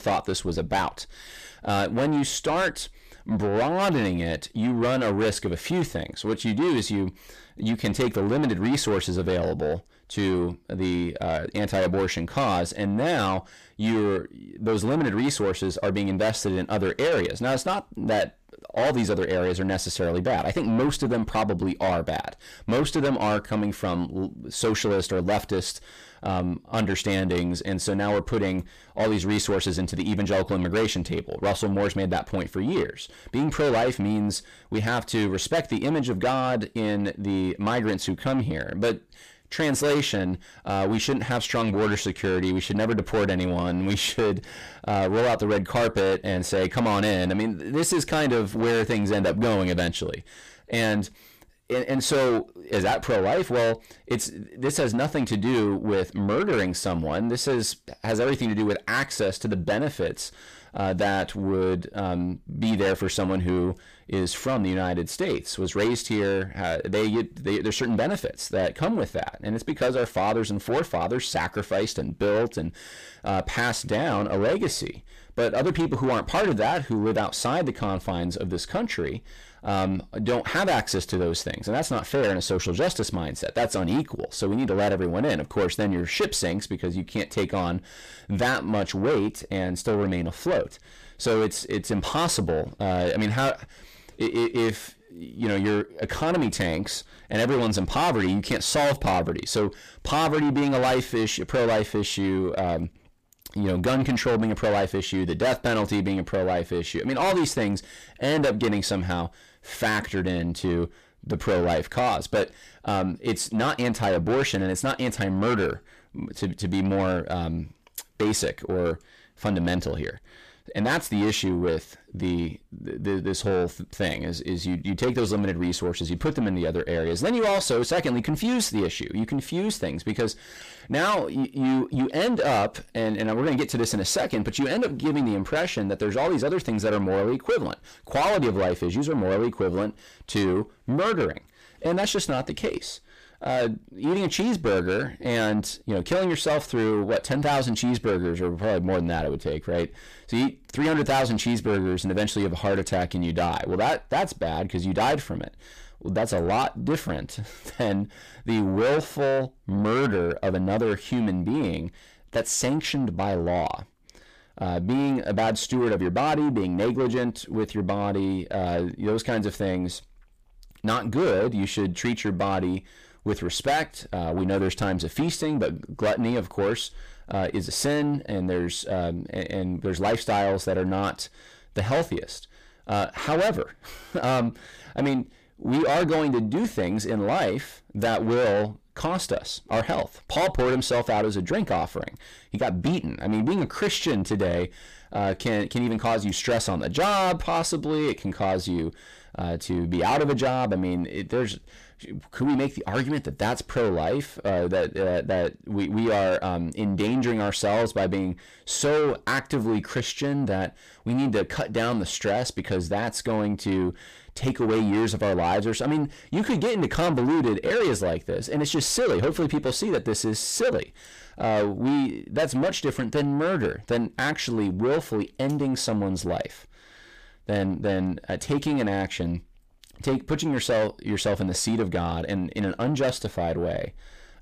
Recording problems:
distortion; heavy; 6 dB below the speech

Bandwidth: 15 kHz